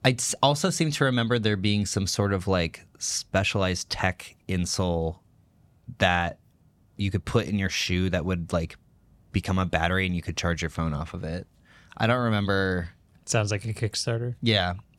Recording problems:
none

